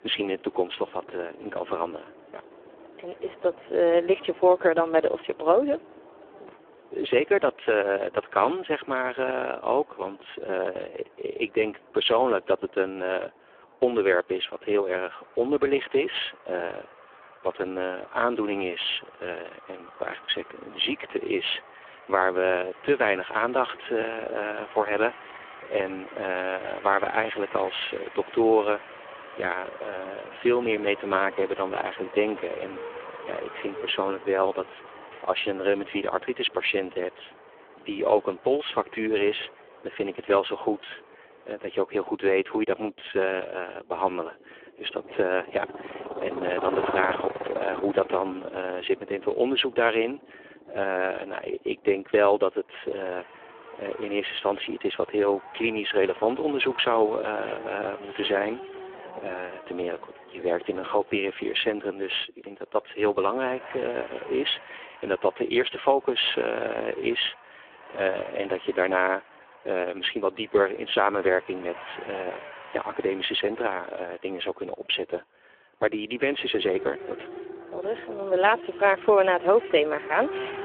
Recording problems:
phone-call audio; poor line; nothing above 3.5 kHz
traffic noise; noticeable; throughout; 15 dB below the speech

